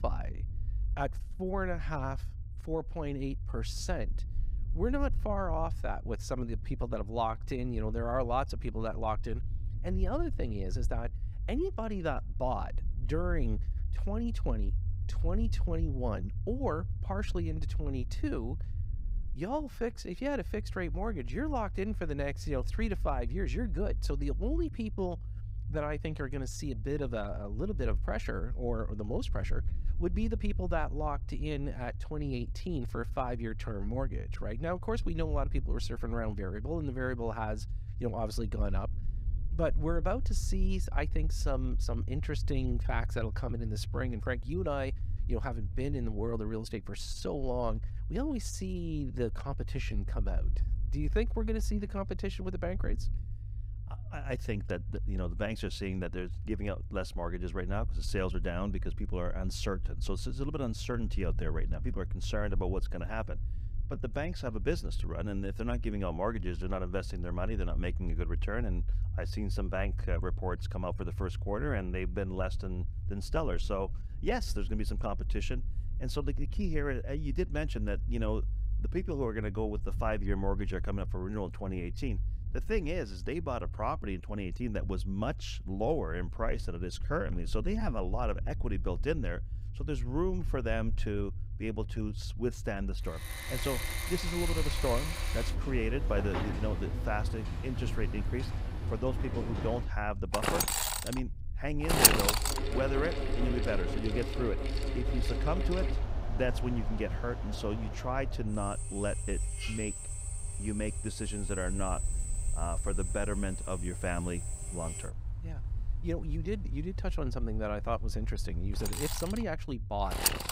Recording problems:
machinery noise; very loud; from 1:33 on; 1 dB above the speech
low rumble; noticeable; throughout; 20 dB below the speech

